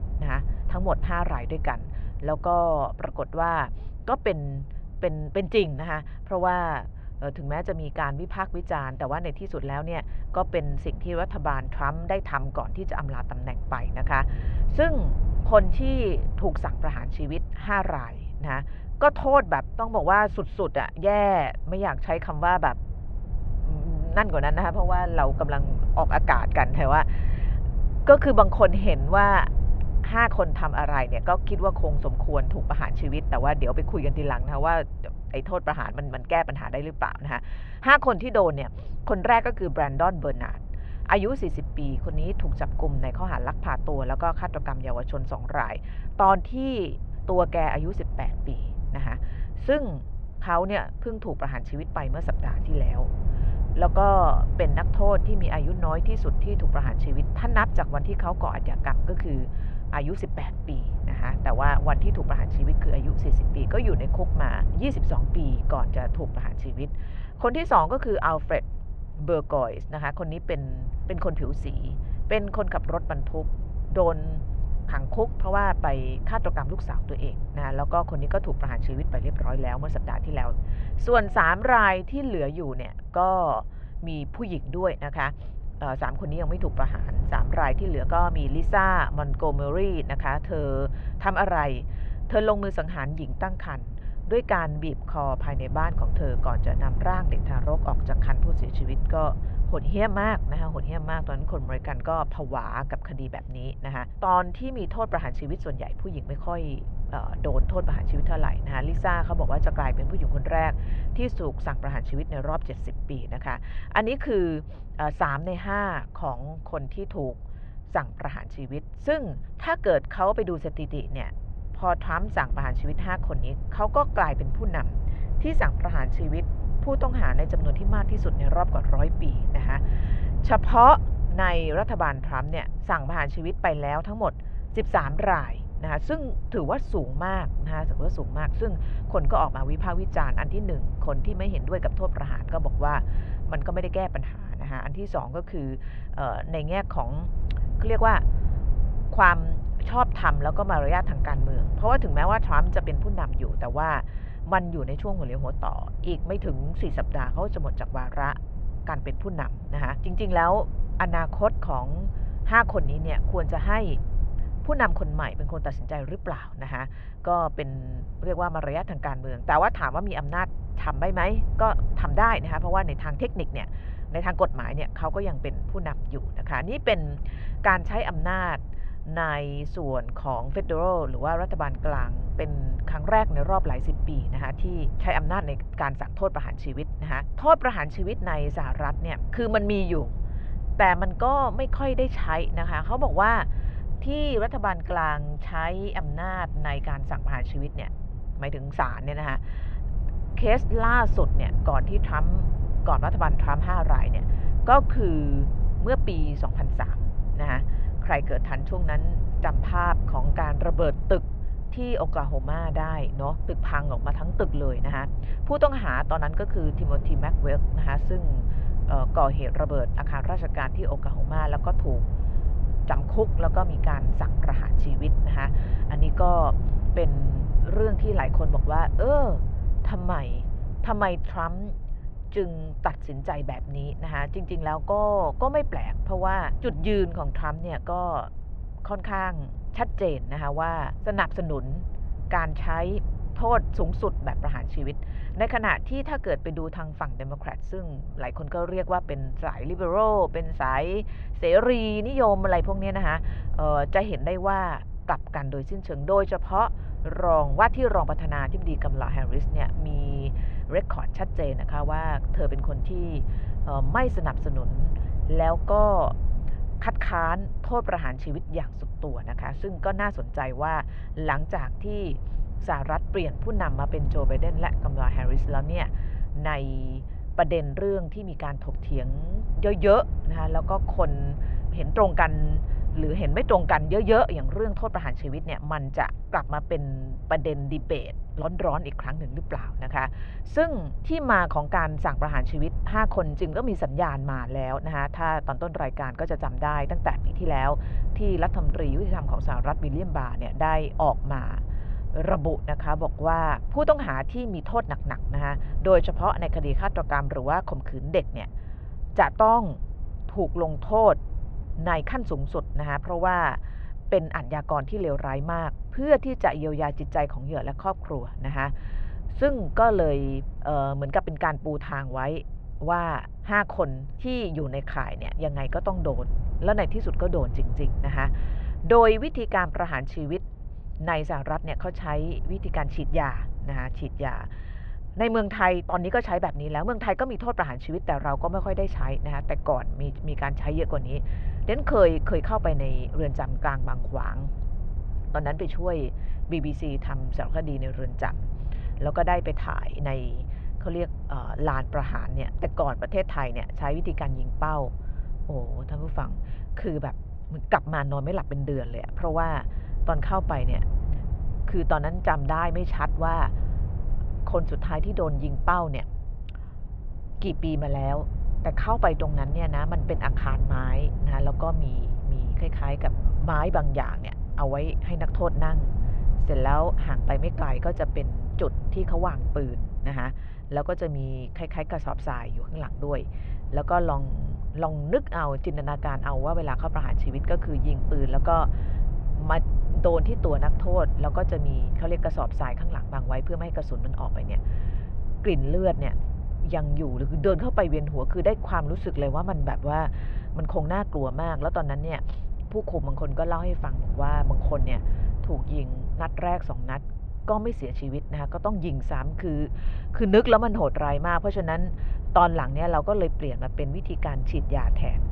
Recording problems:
muffled; very; fading above 2.5 kHz
low rumble; faint; throughout; 20 dB below the speech

